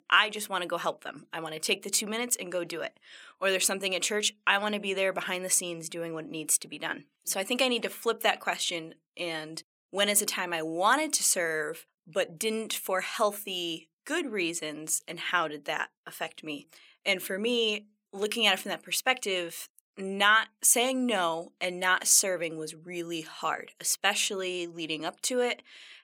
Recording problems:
thin; somewhat; fading below 850 Hz

